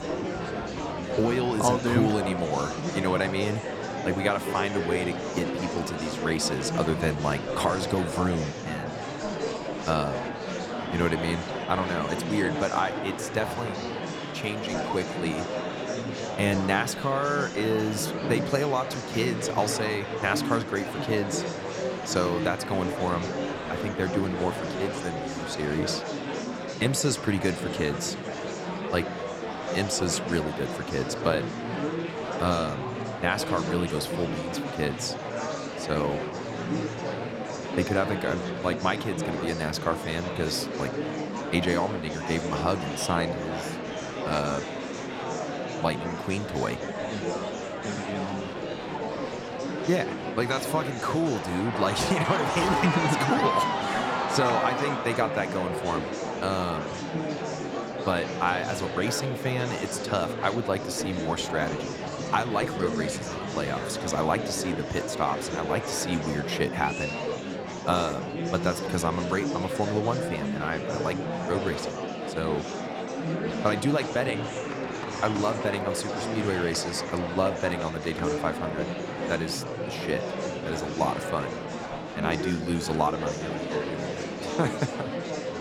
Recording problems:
murmuring crowd; loud; throughout; 2 dB below the speech

